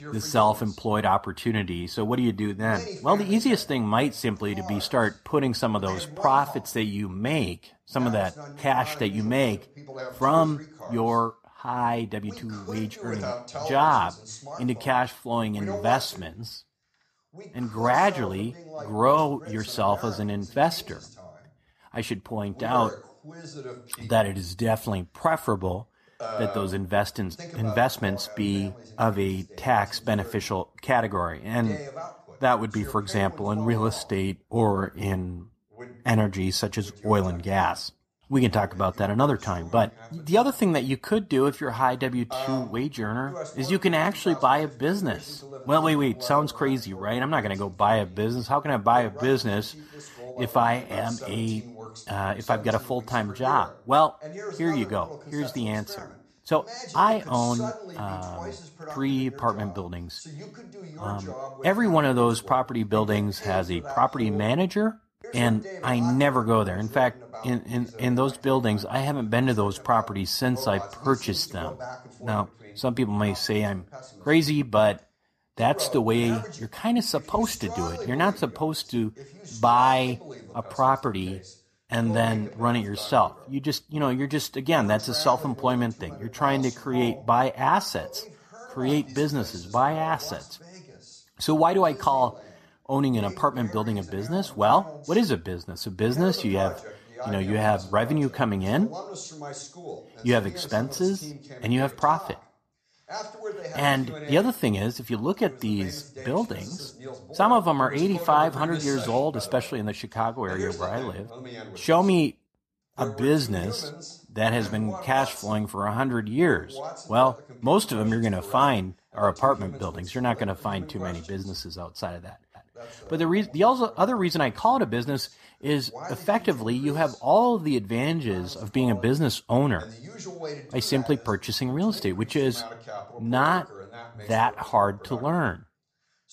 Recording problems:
voice in the background; noticeable; throughout; 15 dB below the speech

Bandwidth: 14.5 kHz